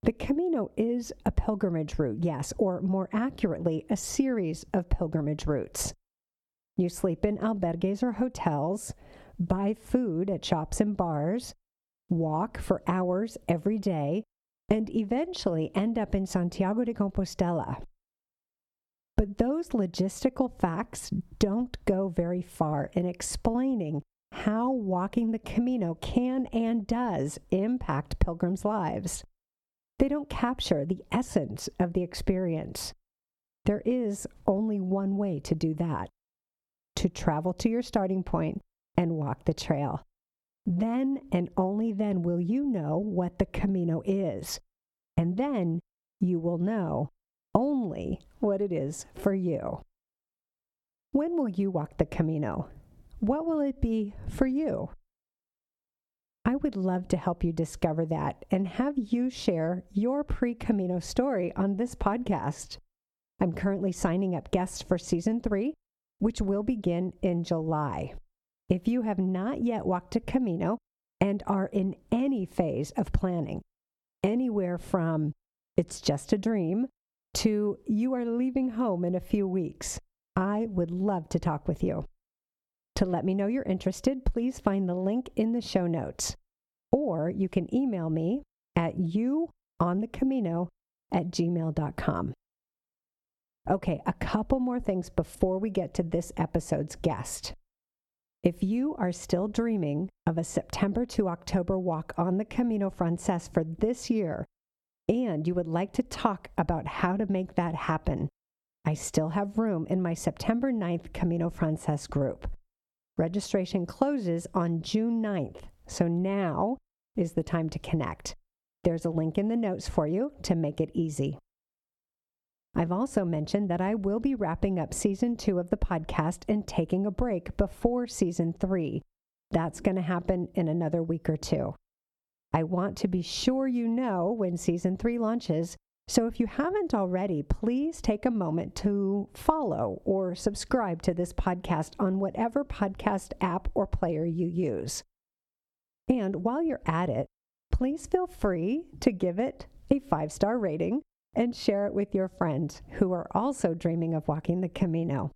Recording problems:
muffled; very slightly; fading above 1.5 kHz
squashed, flat; somewhat

